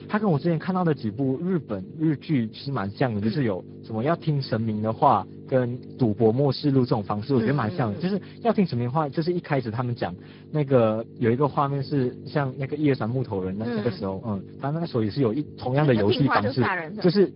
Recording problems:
garbled, watery; badly
high frequencies cut off; noticeable; nothing above 5 kHz
electrical hum; faint; throughout; 50 Hz, 20 dB below the speech

